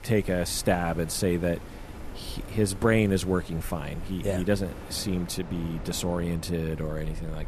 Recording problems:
wind in the background; noticeable; throughout; 15 dB below the speech

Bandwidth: 14 kHz